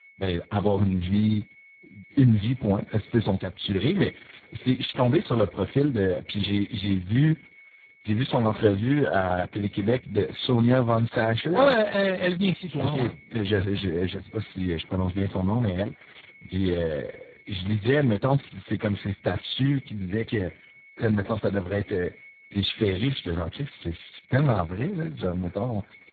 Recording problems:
garbled, watery; badly; nothing above 4 kHz
high-pitched whine; faint; throughout; 2 kHz, 25 dB below the speech

